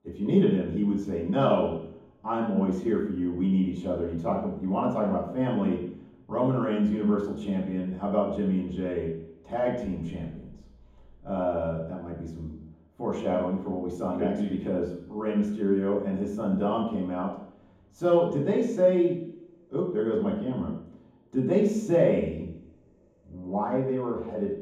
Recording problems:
off-mic speech; far
room echo; noticeable; dies away in 1.2 s

